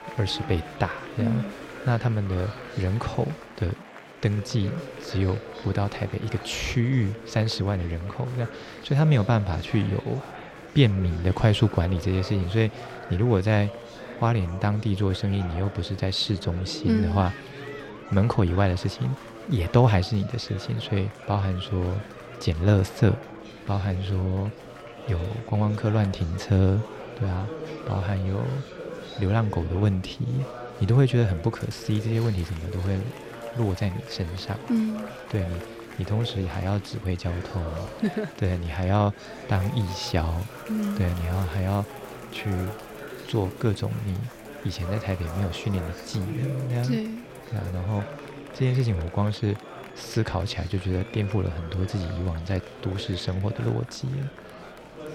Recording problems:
murmuring crowd; noticeable; throughout; 15 dB below the speech

